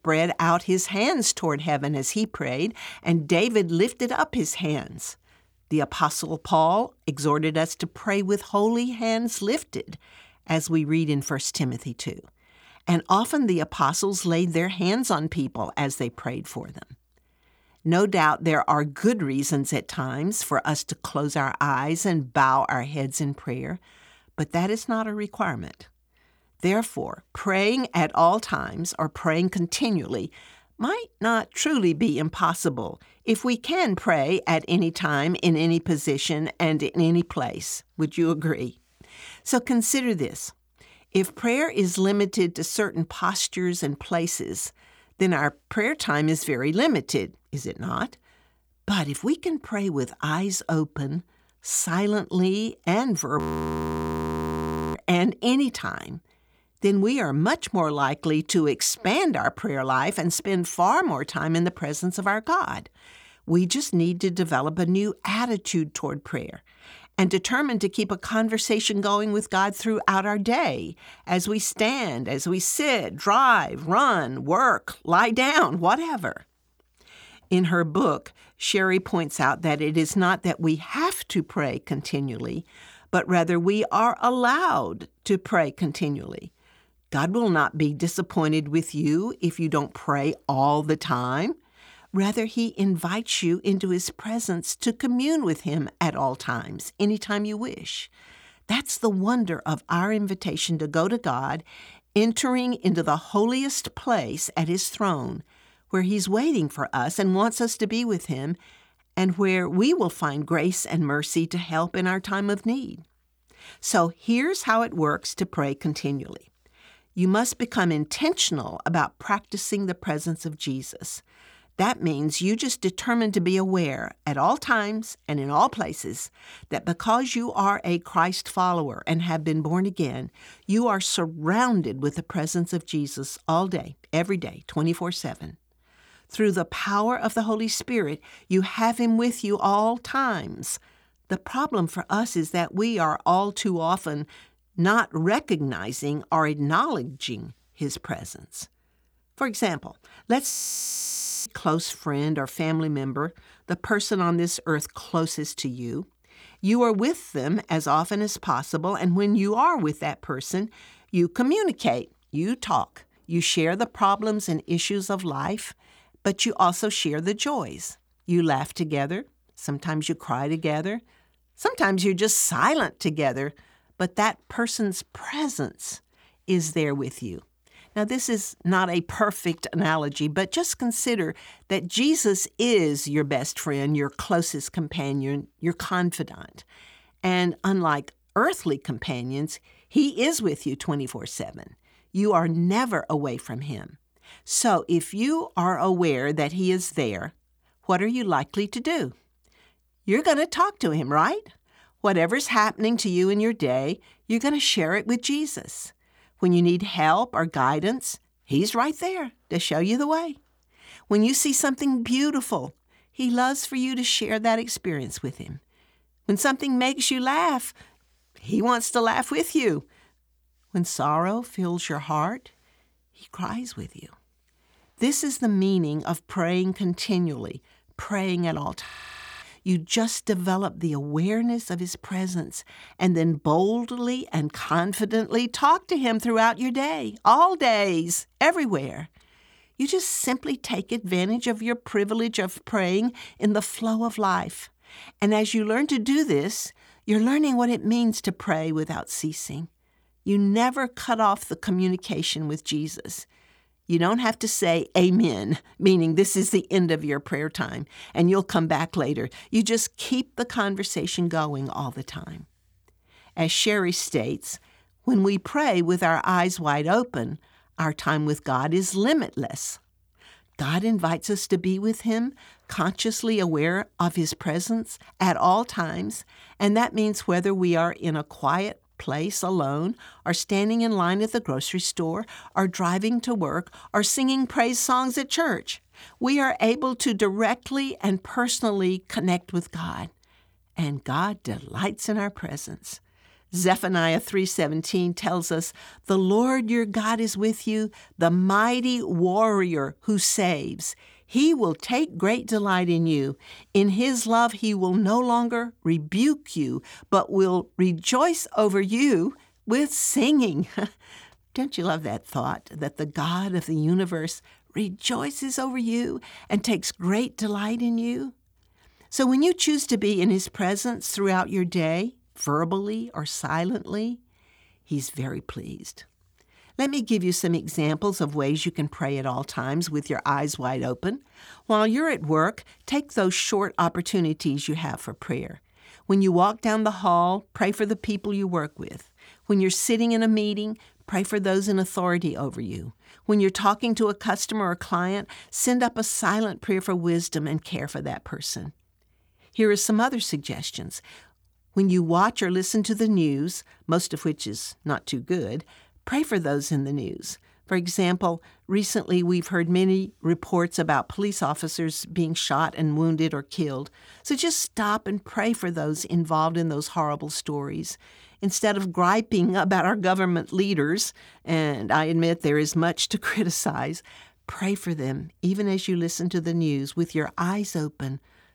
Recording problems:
audio freezing; at 53 s for 1.5 s, at 2:31 for 1 s and at 3:49 for 0.5 s

